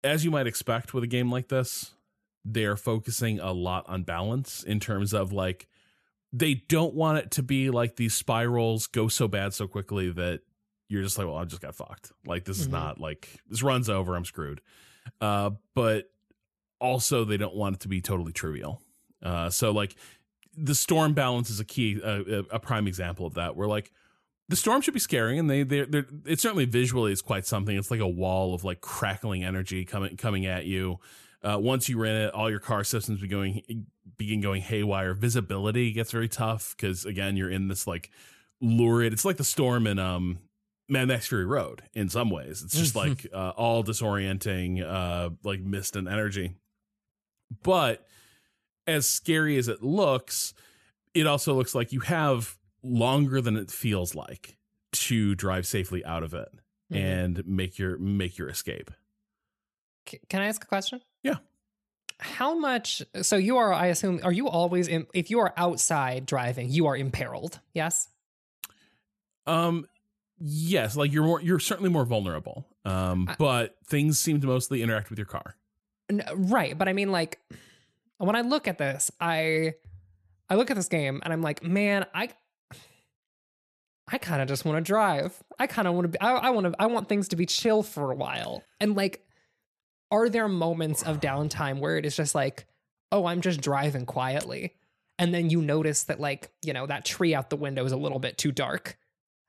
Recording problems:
none

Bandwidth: 13.5 kHz